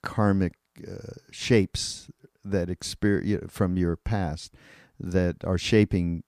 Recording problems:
none

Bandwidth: 15 kHz